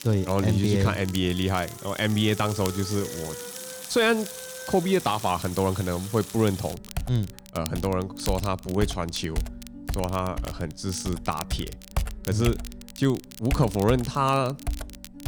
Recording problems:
household noises; noticeable; throughout; 10 dB below the speech
background music; noticeable; throughout; 20 dB below the speech
crackle, like an old record; noticeable; 15 dB below the speech

